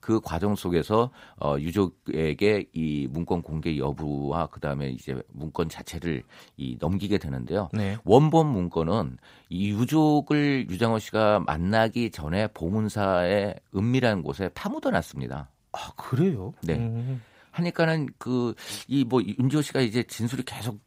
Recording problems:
none

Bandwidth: 15.5 kHz